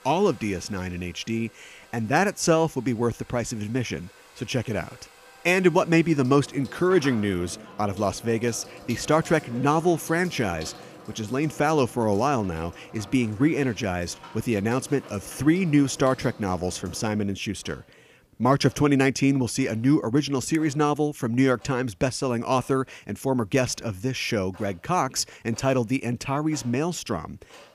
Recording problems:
household noises; faint; throughout; 20 dB below the speech

